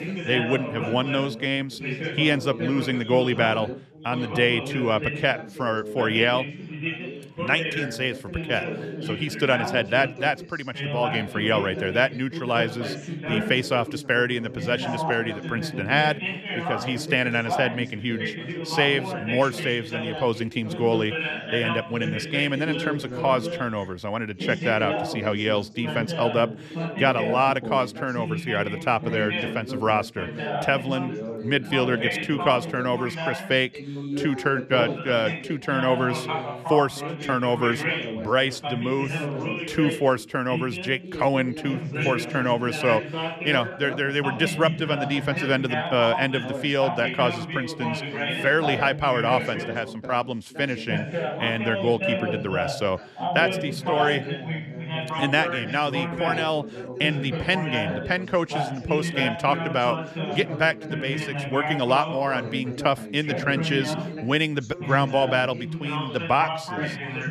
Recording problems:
background chatter; loud; throughout; 3 voices, 5 dB below the speech

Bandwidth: 14 kHz